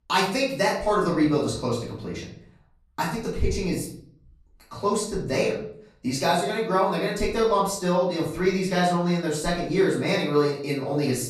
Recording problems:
off-mic speech; far
room echo; noticeable; dies away in 0.5 s

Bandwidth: 14.5 kHz